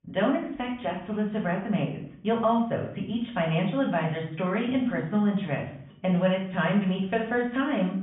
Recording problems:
off-mic speech; far
high frequencies cut off; severe; nothing above 3.5 kHz
room echo; slight; dies away in 0.5 s

